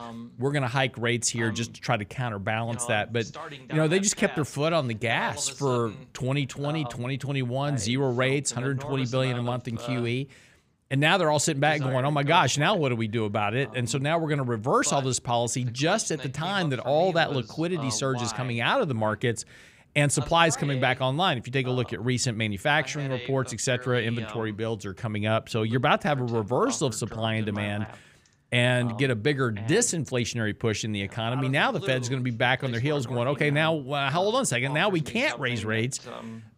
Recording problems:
voice in the background; noticeable; throughout; 15 dB below the speech

